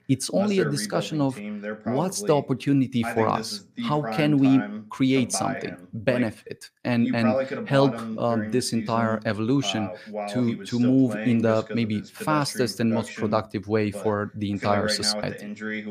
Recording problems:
voice in the background; loud; throughout; 8 dB below the speech

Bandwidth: 15 kHz